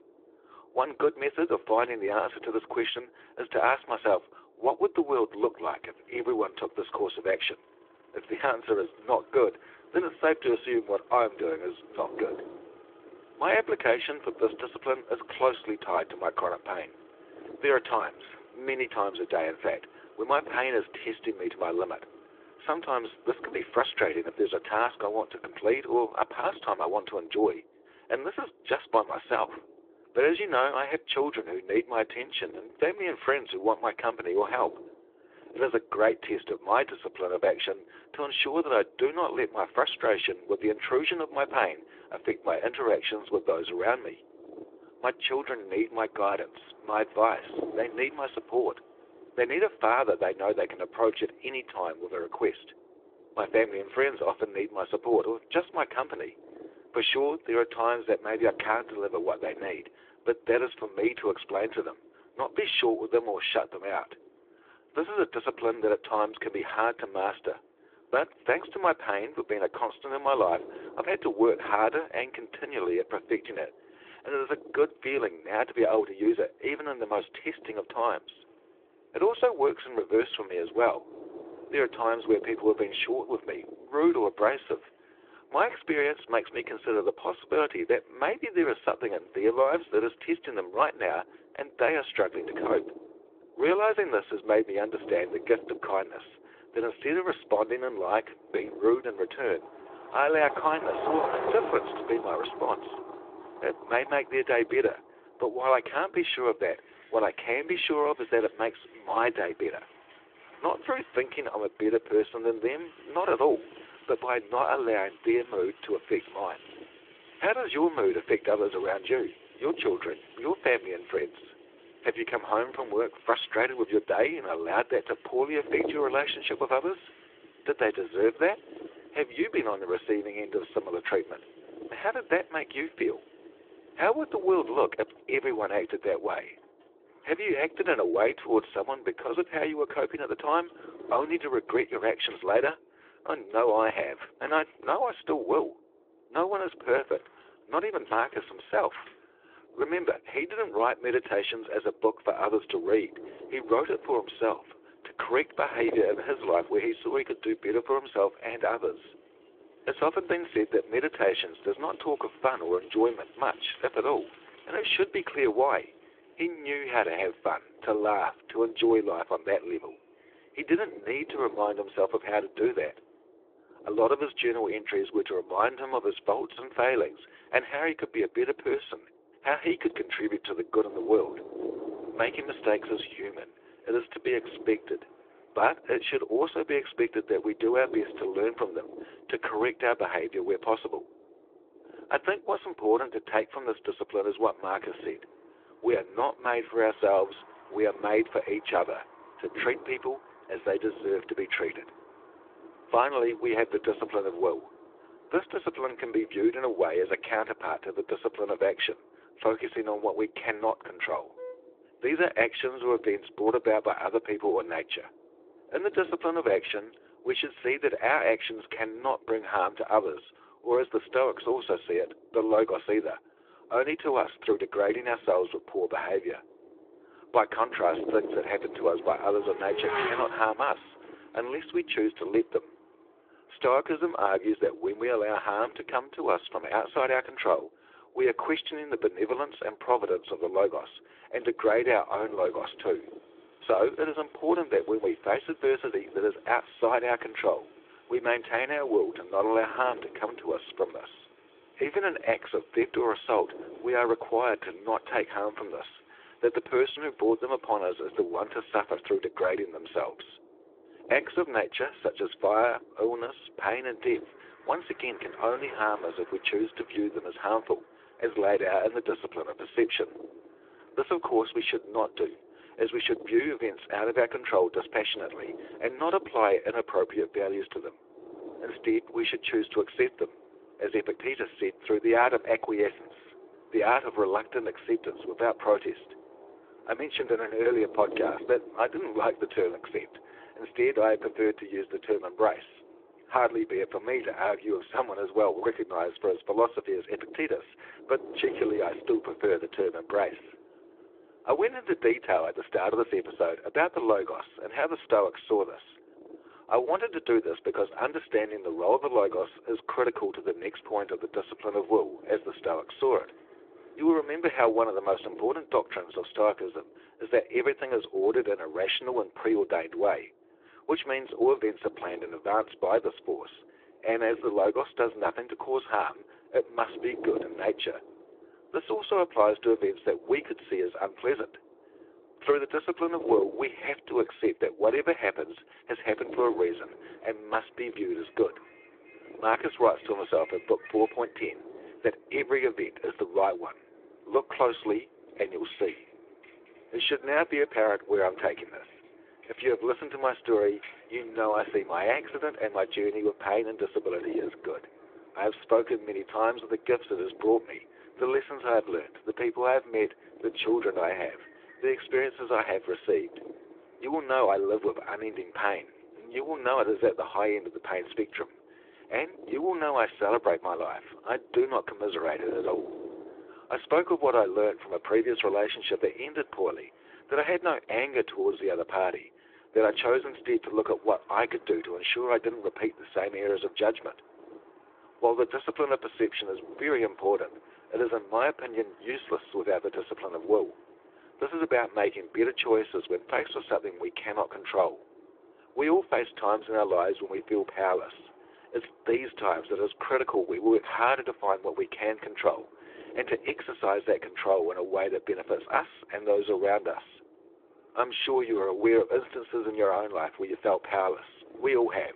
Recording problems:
phone-call audio; nothing above 3.5 kHz
traffic noise; noticeable; throughout; 20 dB below the speech
wind noise on the microphone; occasional gusts; 20 dB below the speech

